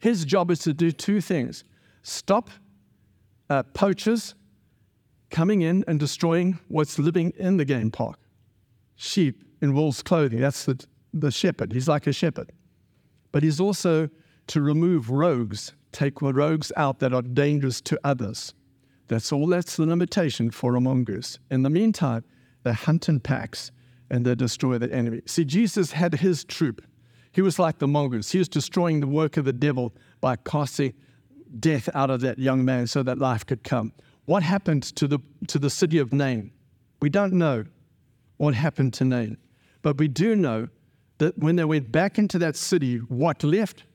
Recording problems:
none

